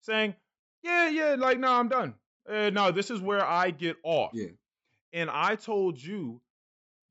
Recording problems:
high frequencies cut off; noticeable; nothing above 8 kHz

